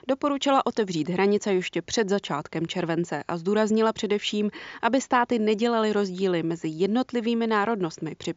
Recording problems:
high frequencies cut off; noticeable; nothing above 7.5 kHz

